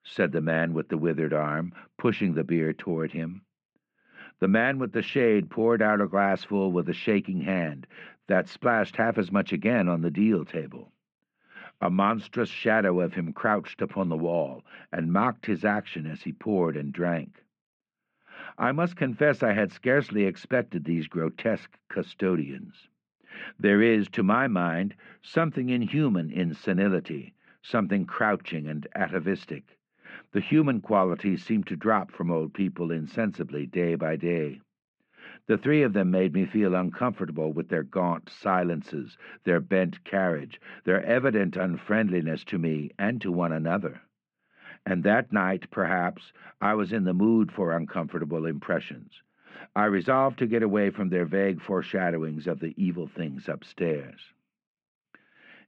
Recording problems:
muffled; very; fading above 2.5 kHz

